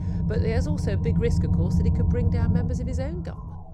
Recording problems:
low rumble; loud; throughout; 2 dB below the speech

